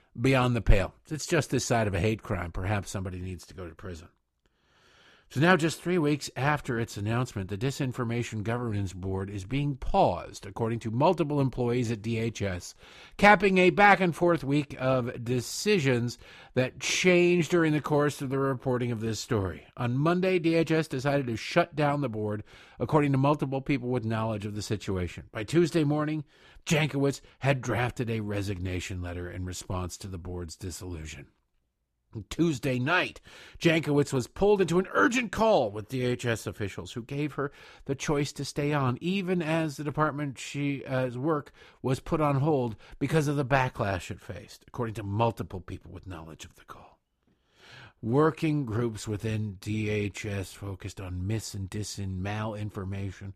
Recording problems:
none

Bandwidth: 14.5 kHz